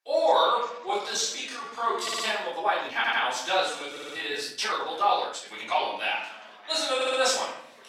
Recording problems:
off-mic speech; far
thin; very; fading below 950 Hz
room echo; noticeable; dies away in 0.7 s
background chatter; faint; throughout; 2 voices, 20 dB below the speech
uneven, jittery; strongly; from 1 to 6 s
audio stuttering; 4 times, first at 2 s

